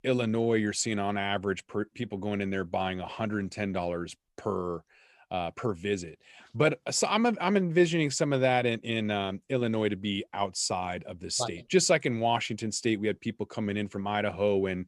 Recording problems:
none

